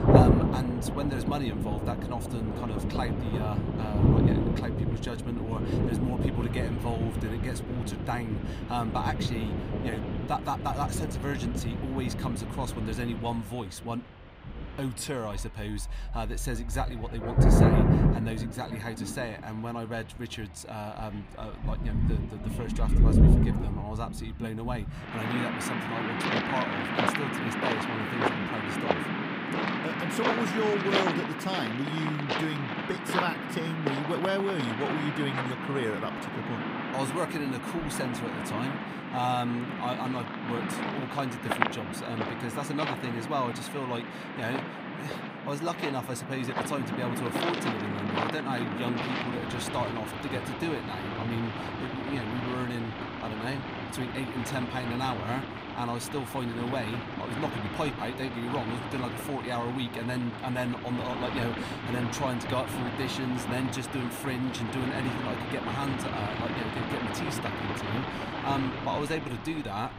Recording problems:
rain or running water; very loud; throughout; 3 dB above the speech

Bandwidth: 15.5 kHz